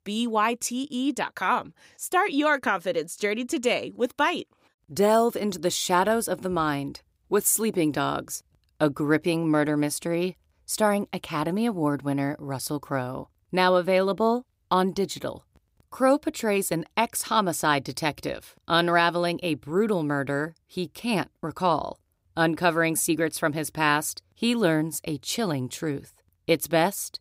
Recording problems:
none

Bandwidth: 15.5 kHz